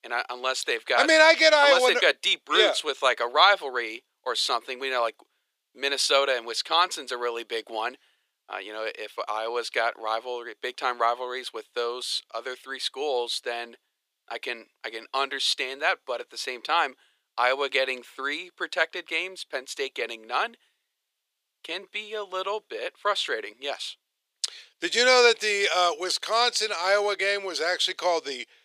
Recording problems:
thin; very; fading below 400 Hz

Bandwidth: 15 kHz